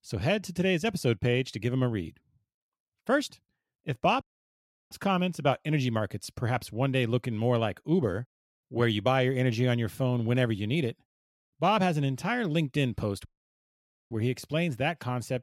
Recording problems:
audio cutting out; at 4 s for 0.5 s and at 13 s for 1 s

